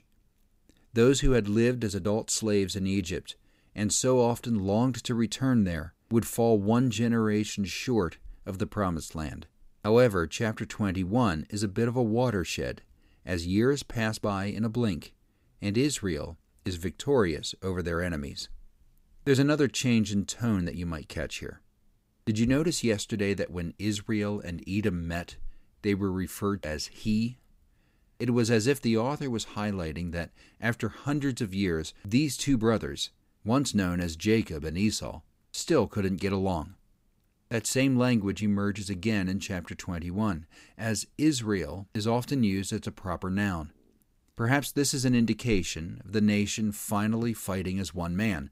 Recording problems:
none

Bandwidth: 15.5 kHz